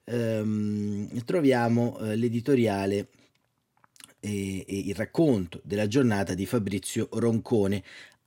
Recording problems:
none

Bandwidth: 16.5 kHz